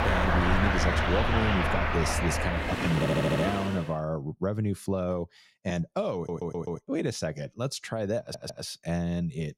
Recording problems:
traffic noise; very loud; until 3.5 s; 3 dB above the speech
train or aircraft noise; noticeable; until 2.5 s; 15 dB below the speech
audio stuttering; at 3 s, at 6 s and at 8 s

